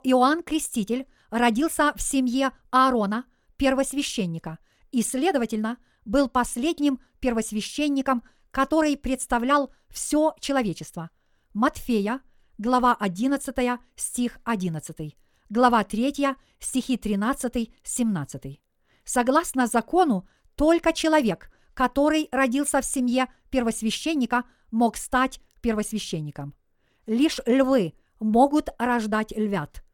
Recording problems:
wrong speed, natural pitch; too fast; 1.5 times normal speed

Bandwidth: 17.5 kHz